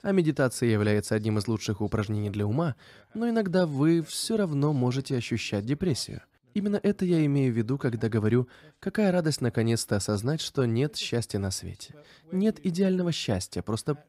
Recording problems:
none

